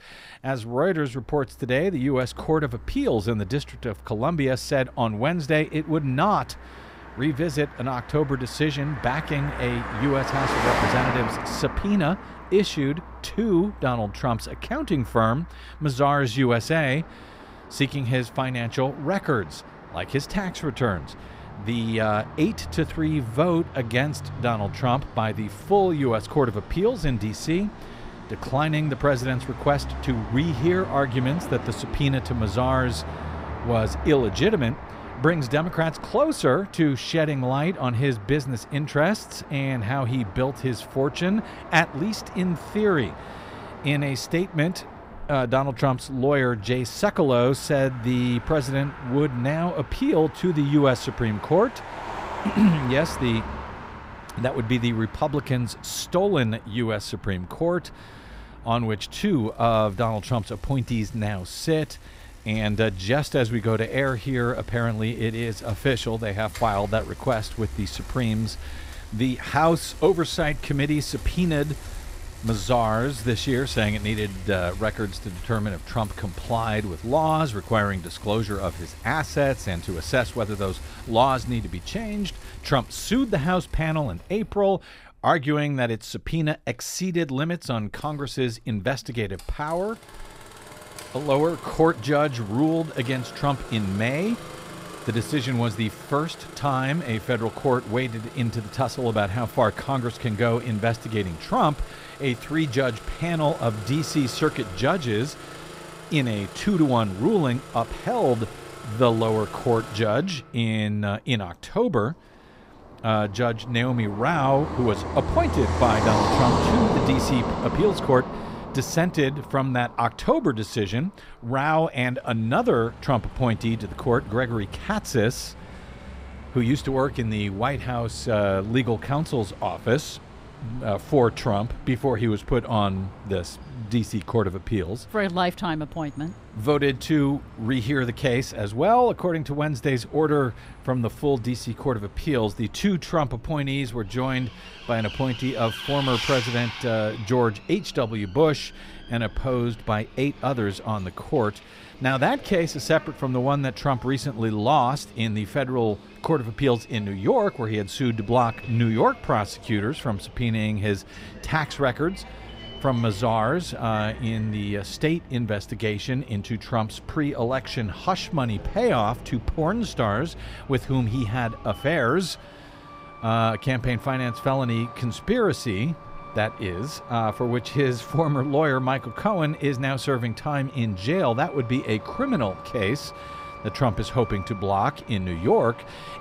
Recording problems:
traffic noise; noticeable; throughout; 10 dB below the speech

